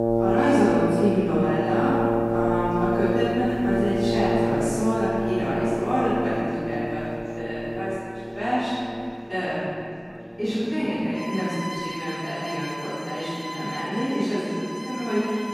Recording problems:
room echo; strong; dies away in 2.2 s
off-mic speech; far
background music; loud; throughout; 2 dB below the speech
chatter from many people; faint; throughout; 25 dB below the speech

